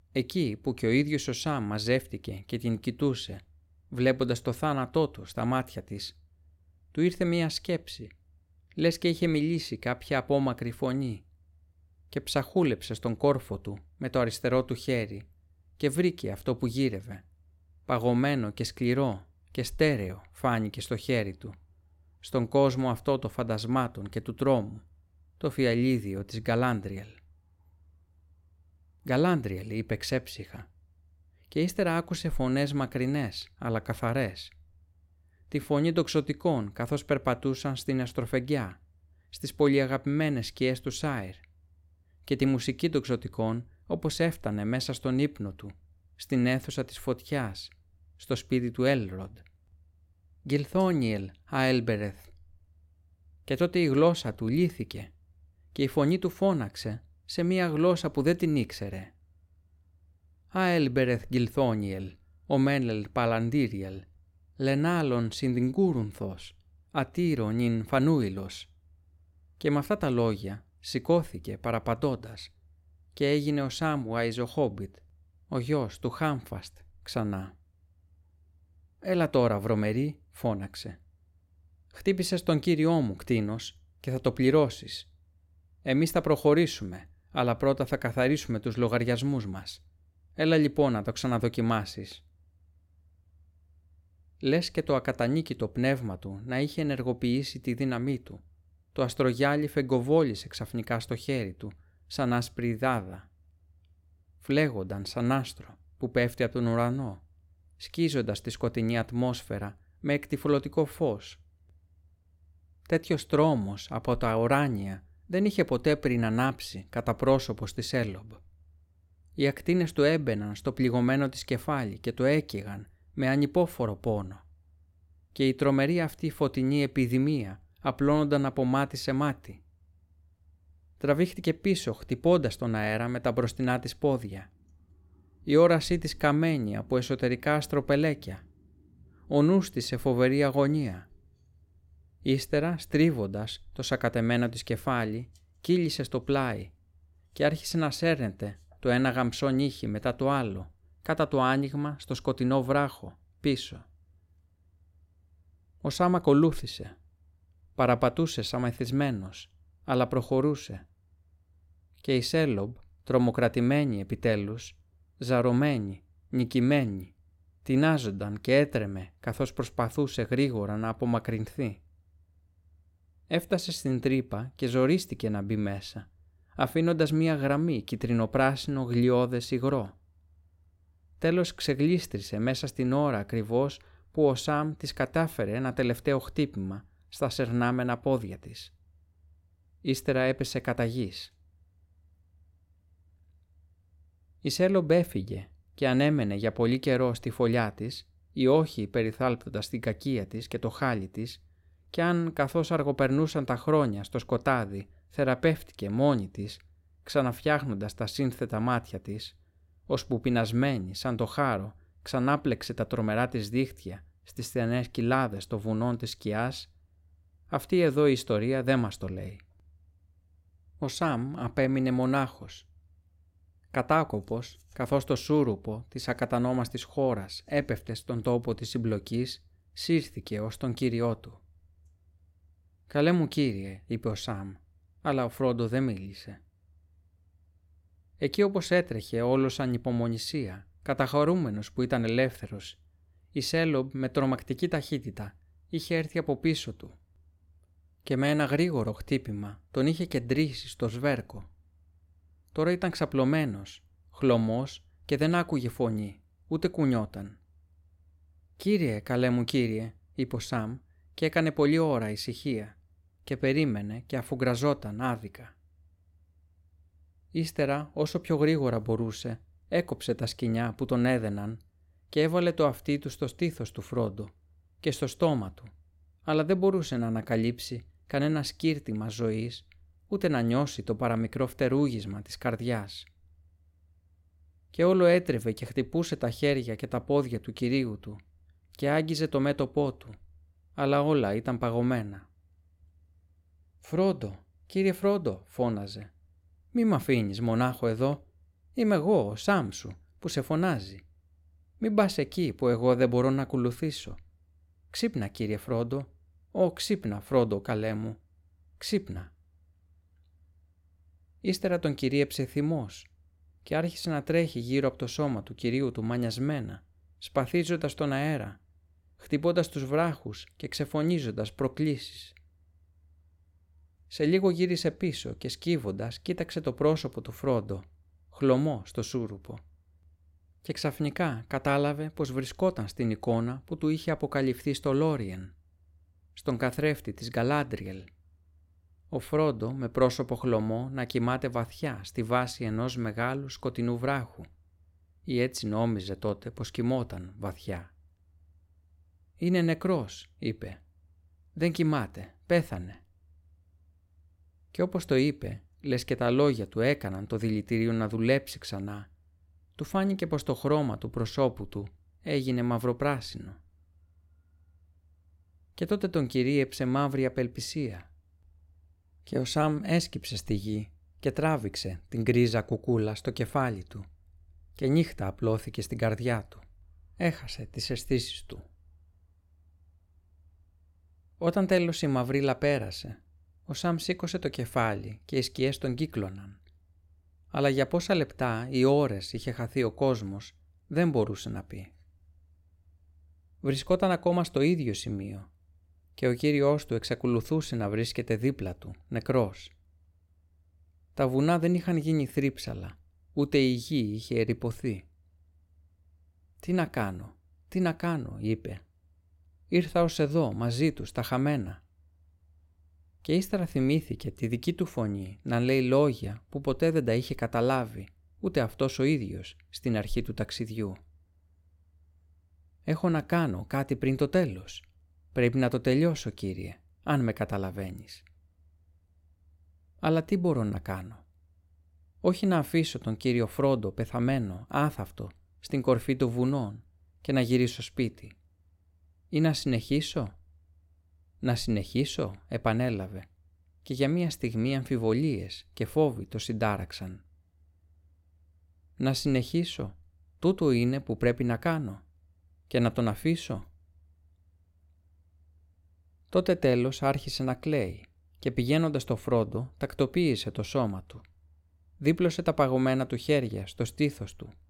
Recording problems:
none

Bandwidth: 16.5 kHz